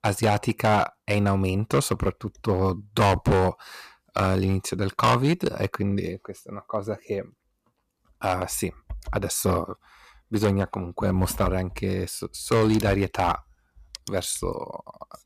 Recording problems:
distortion; heavy; 4% of the sound clipped

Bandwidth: 14.5 kHz